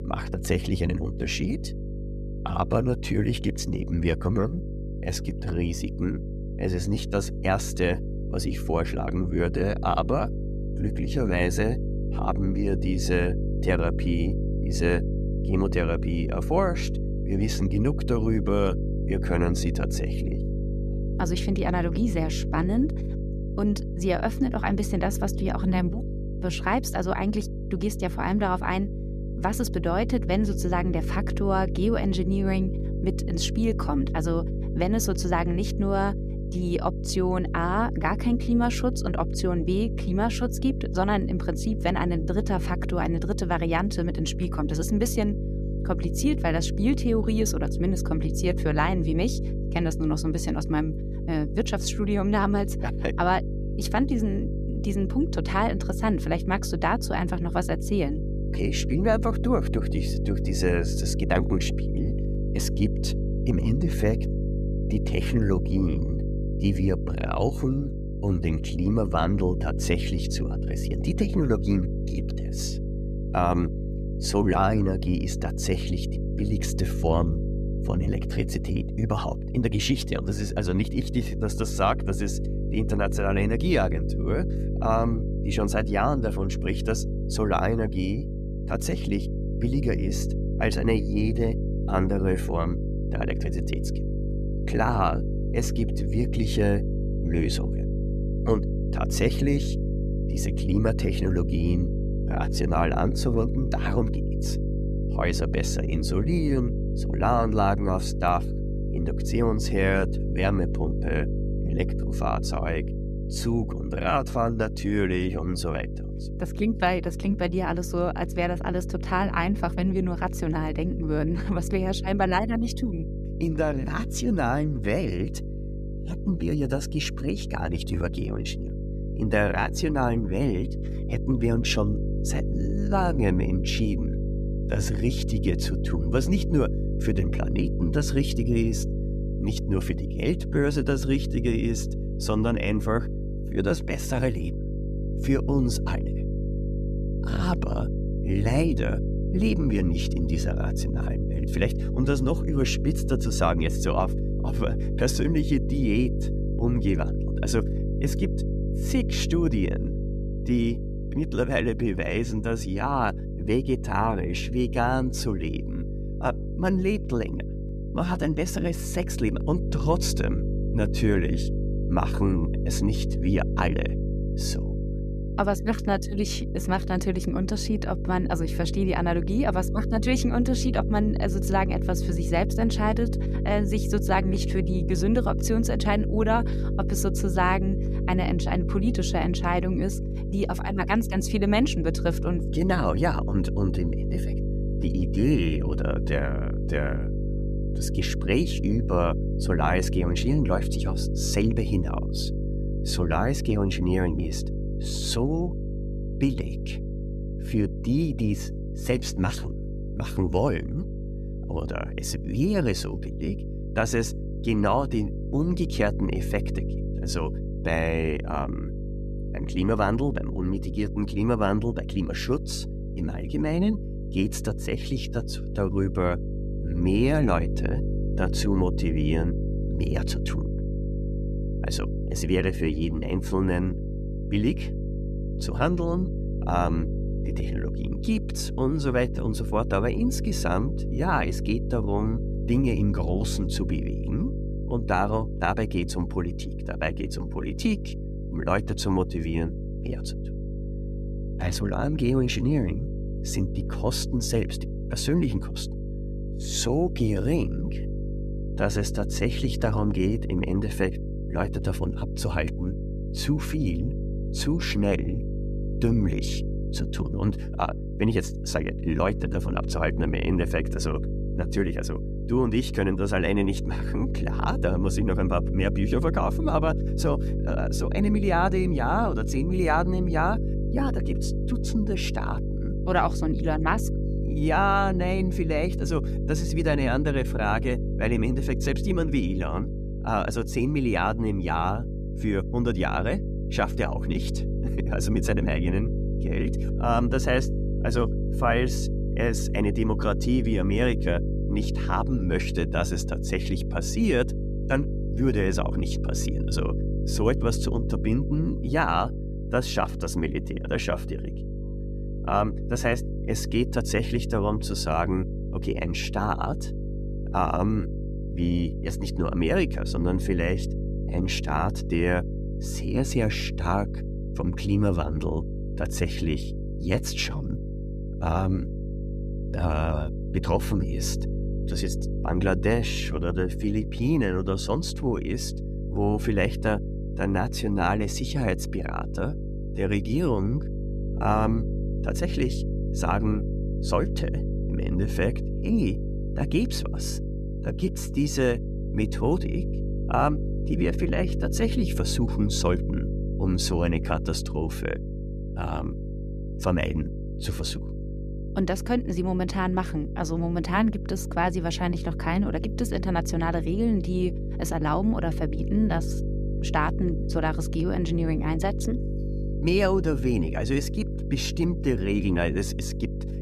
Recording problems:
electrical hum; loud; throughout; 50 Hz, 10 dB below the speech

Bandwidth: 14.5 kHz